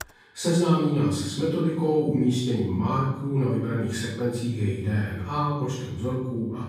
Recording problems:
room echo; strong; dies away in 0.9 s
off-mic speech; far
keyboard typing; very faint; at the start; peak 15 dB below the speech

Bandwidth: 15.5 kHz